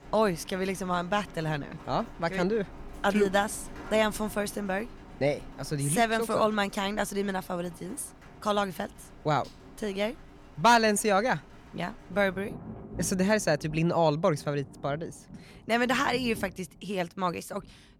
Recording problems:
rain or running water; noticeable; throughout; 20 dB below the speech

